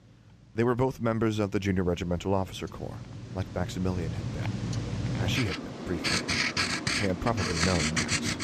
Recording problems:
household noises; very loud; throughout; 1 dB above the speech

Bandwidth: 14.5 kHz